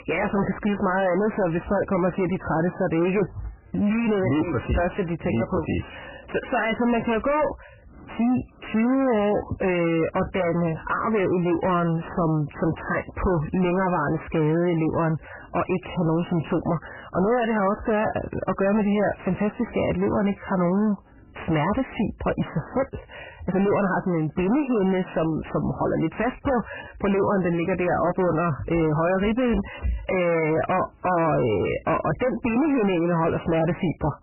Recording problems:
distortion; heavy; 6 dB below the speech
garbled, watery; badly; nothing above 3 kHz

